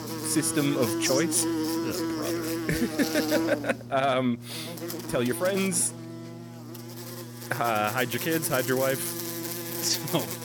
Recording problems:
electrical hum; loud; throughout; 60 Hz, 6 dB below the speech

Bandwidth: 18 kHz